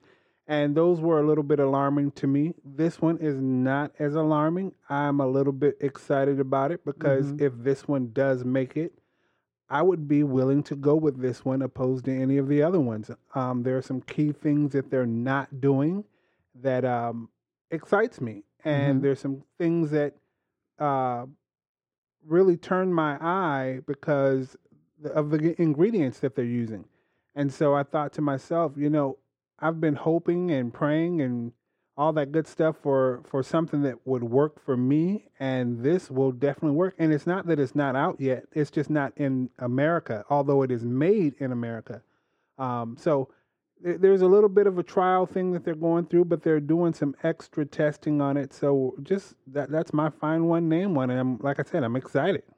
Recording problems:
muffled; very; fading above 3 kHz

